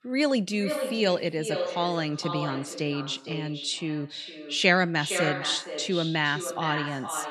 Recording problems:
echo of what is said; strong; throughout; 460 ms later, 7 dB below the speech

